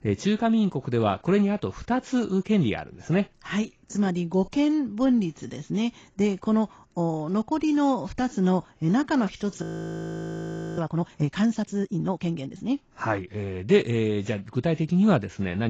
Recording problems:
garbled, watery; badly; nothing above 7.5 kHz
audio freezing; at 9.5 s for 1 s
abrupt cut into speech; at the end

